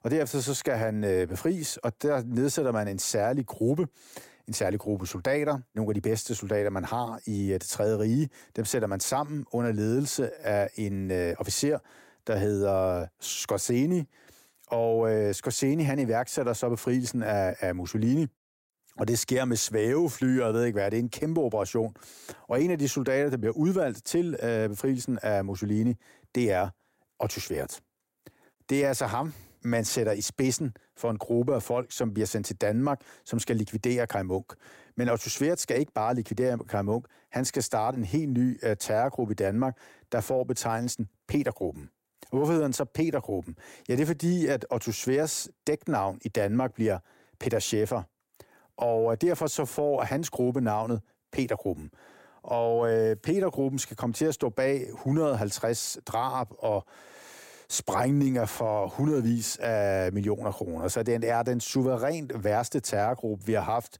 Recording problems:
none

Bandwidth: 16 kHz